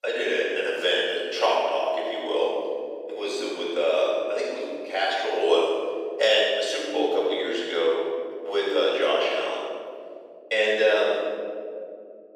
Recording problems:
room echo; strong; dies away in 2.5 s
off-mic speech; far
thin; very; fading below 350 Hz

